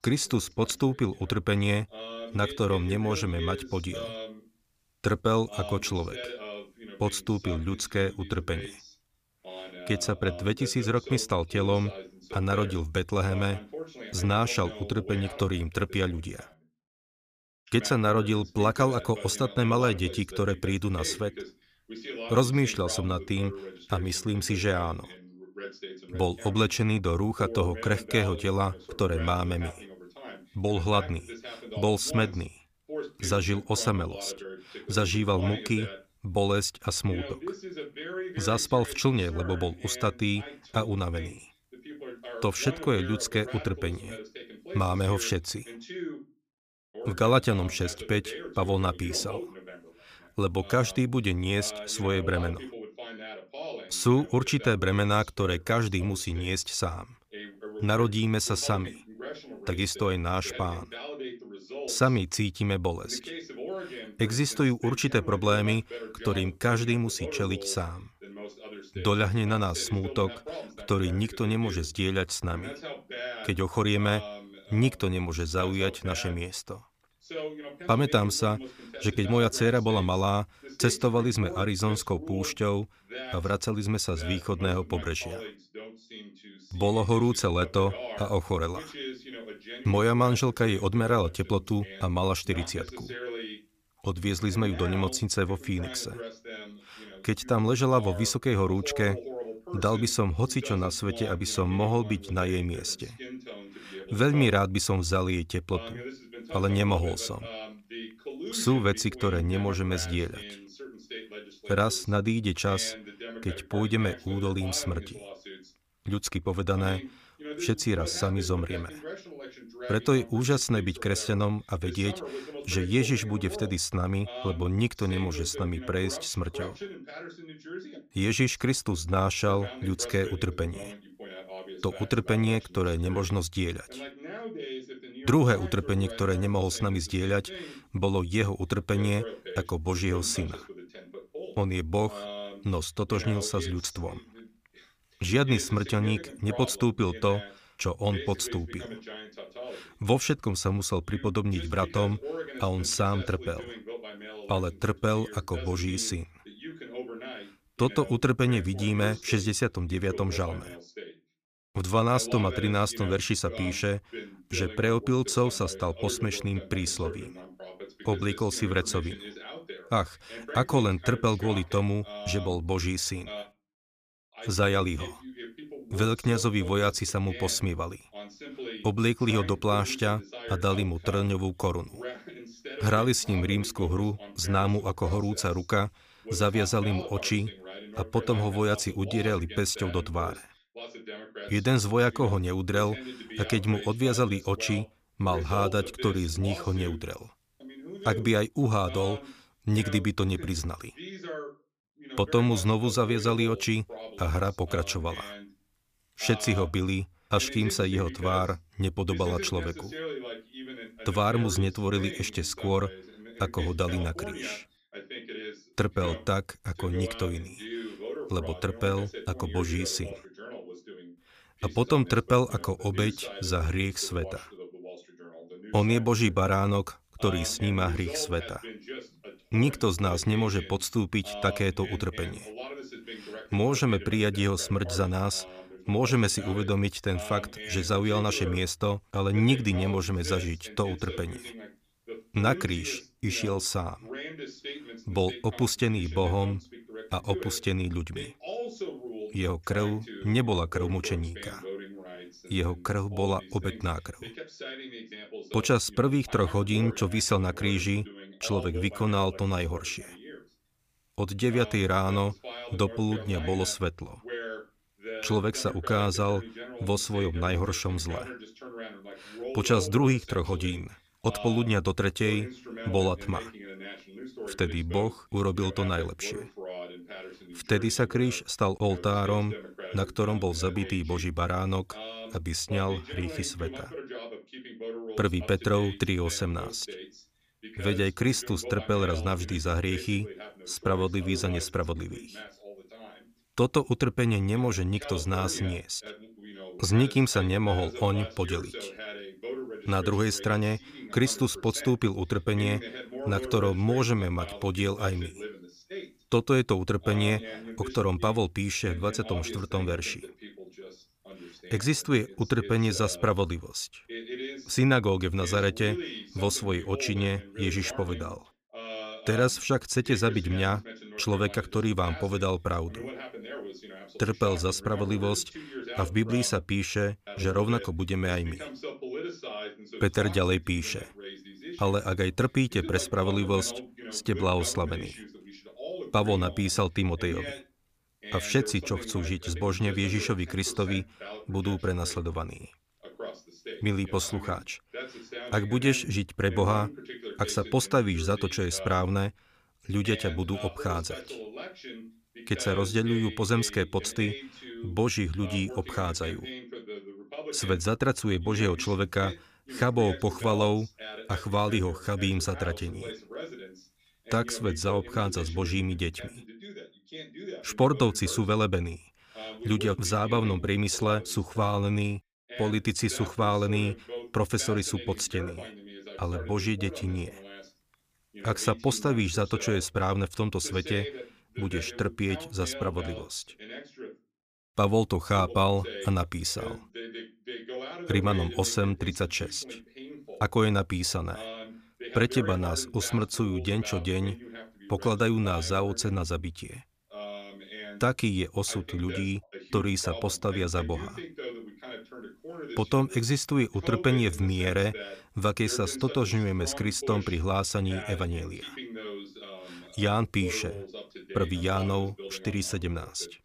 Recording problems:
voice in the background; noticeable; throughout; 15 dB below the speech

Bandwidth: 15 kHz